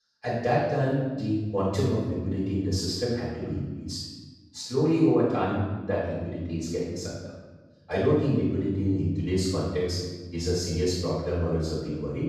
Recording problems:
room echo; strong; dies away in 1.1 s
off-mic speech; far

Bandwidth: 15 kHz